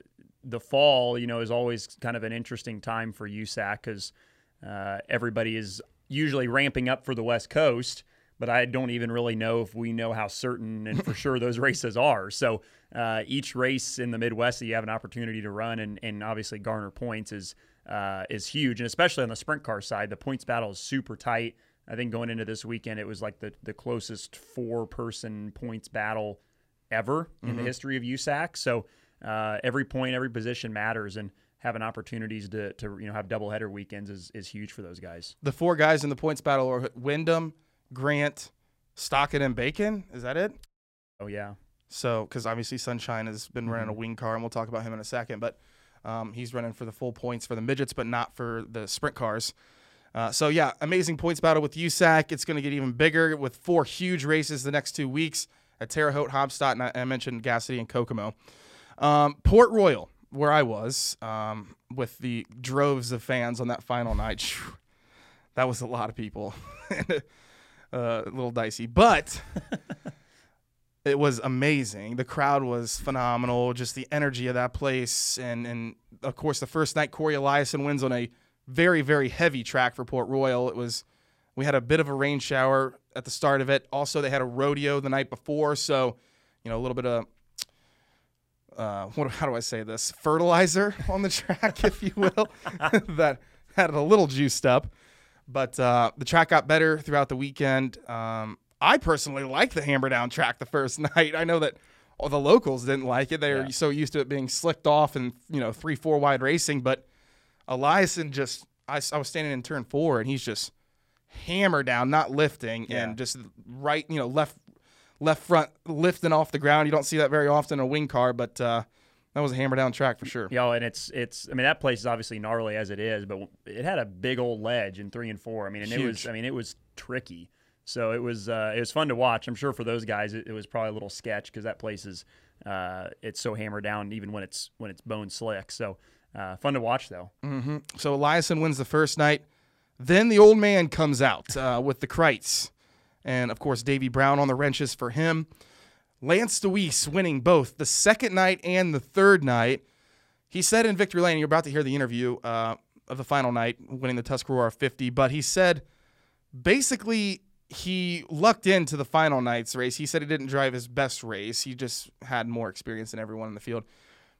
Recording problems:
audio cutting out; at 41 s for 0.5 s

